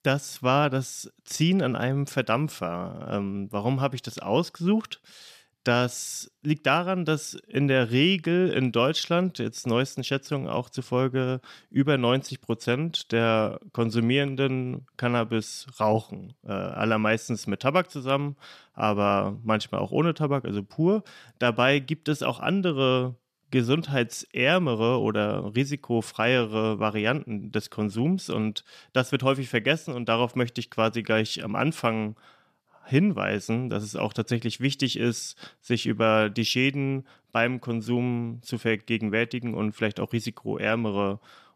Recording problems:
none

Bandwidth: 14.5 kHz